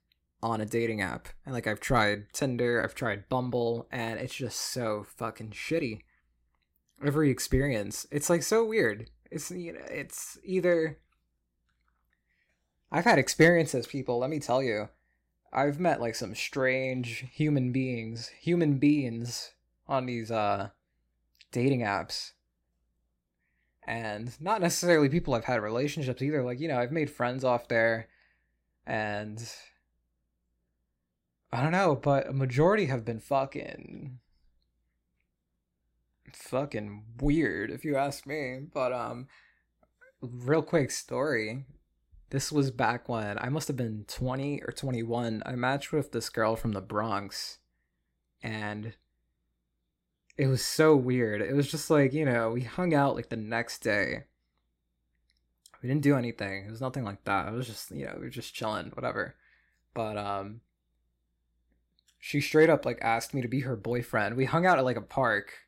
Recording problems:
none

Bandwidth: 16 kHz